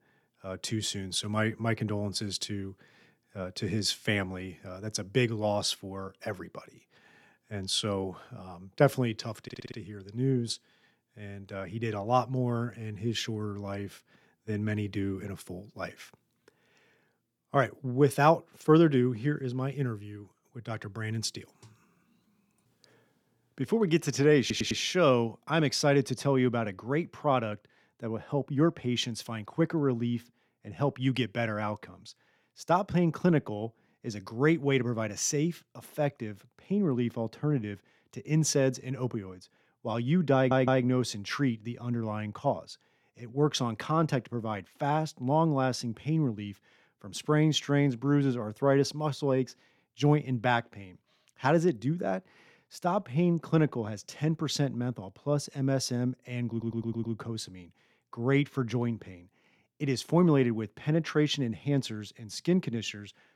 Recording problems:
audio stuttering; 4 times, first at 9.5 s

